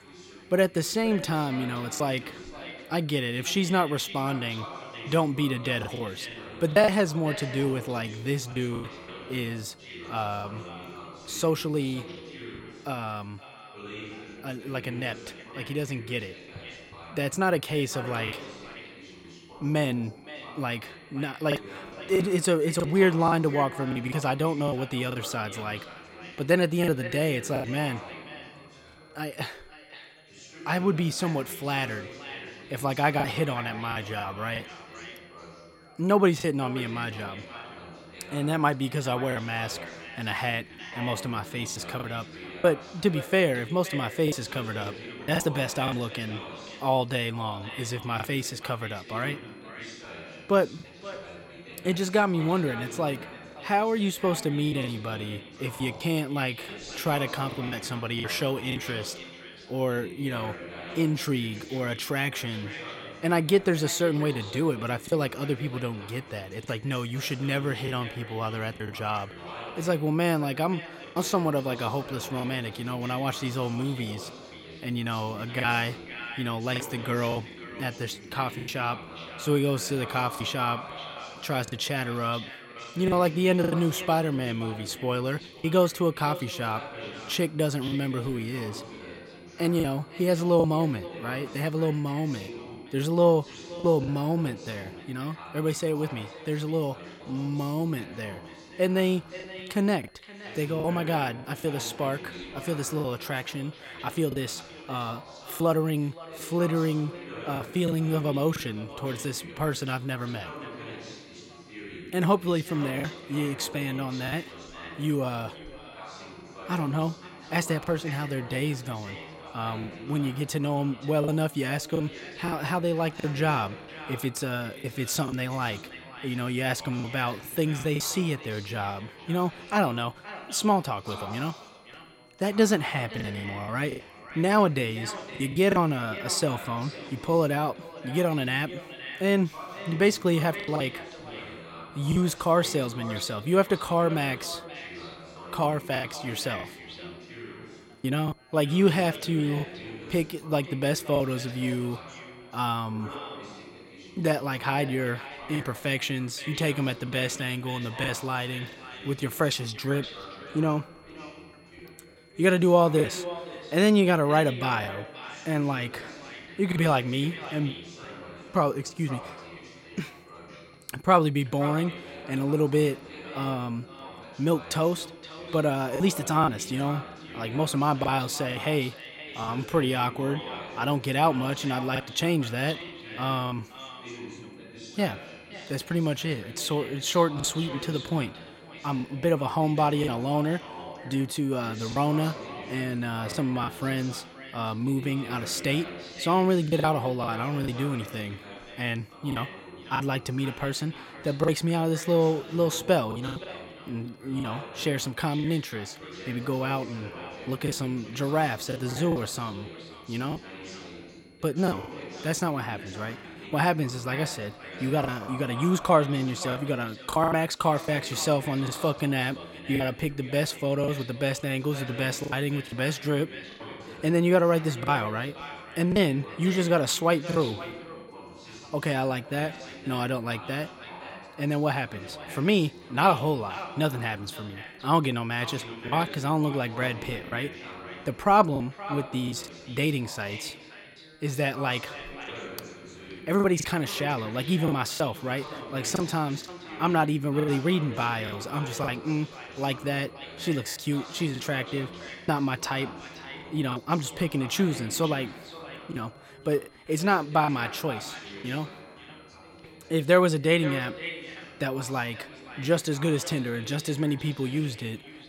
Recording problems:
echo of what is said; noticeable; throughout; 520 ms later, 15 dB below the speech
background chatter; noticeable; throughout; 2 voices, 15 dB below the speech
high-pitched whine; faint; throughout; 2 kHz, 35 dB below the speech
choppy; occasionally; 4% of the speech affected

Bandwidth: 16 kHz